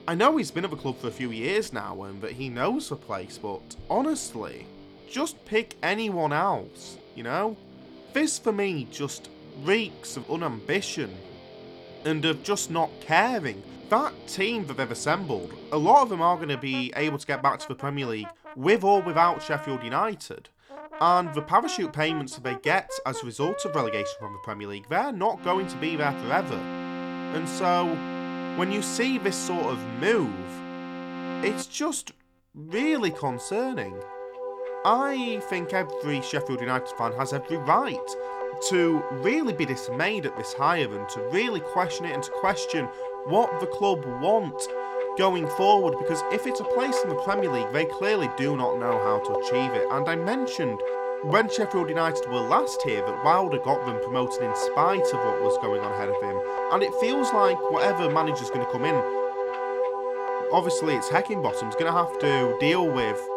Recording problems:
background music; loud; throughout; 3 dB below the speech

